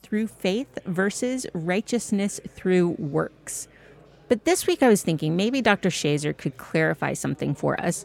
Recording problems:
chatter from many people; faint; throughout; 30 dB below the speech

